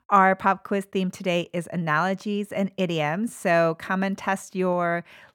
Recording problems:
none

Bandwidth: 18.5 kHz